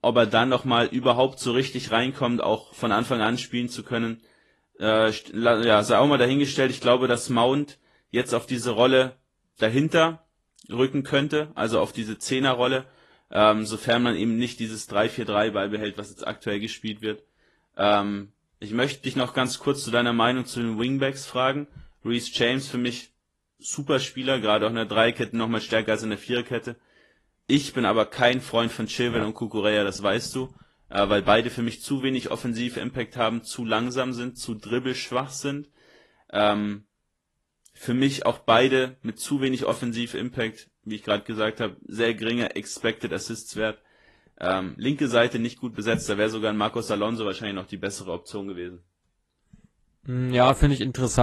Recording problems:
garbled, watery; slightly; nothing above 11.5 kHz
abrupt cut into speech; at the end

